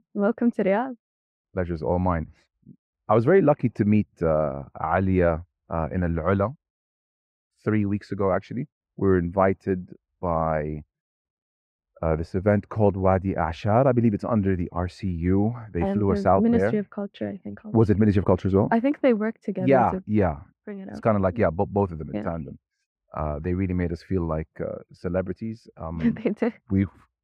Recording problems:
muffled; very; fading above 3 kHz

